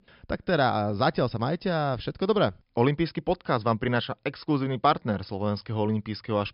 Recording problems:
high frequencies cut off; noticeable; nothing above 5.5 kHz

